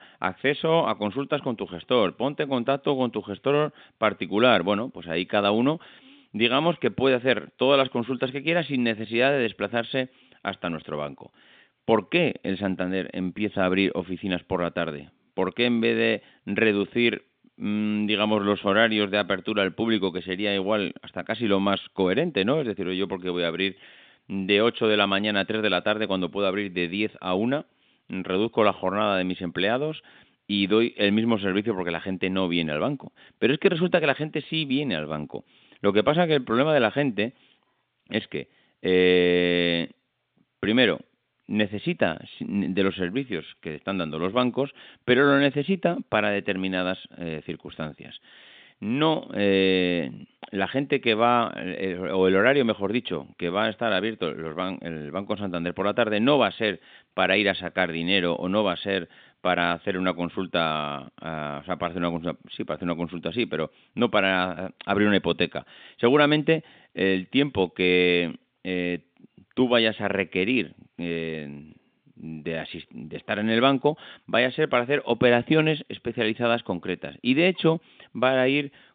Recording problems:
phone-call audio; nothing above 3.5 kHz

